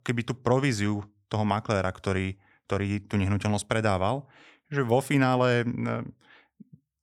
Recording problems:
none

